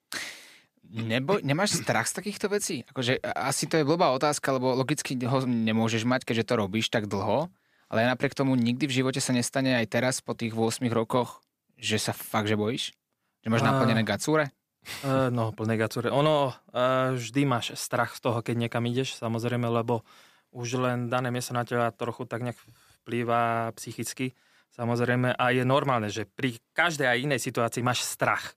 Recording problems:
none

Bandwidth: 15 kHz